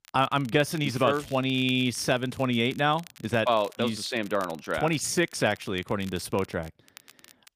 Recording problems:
crackle, like an old record; faint; 25 dB below the speech

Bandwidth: 15 kHz